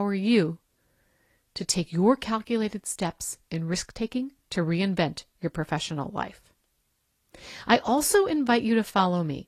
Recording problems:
garbled, watery; slightly; nothing above 14 kHz
abrupt cut into speech; at the start

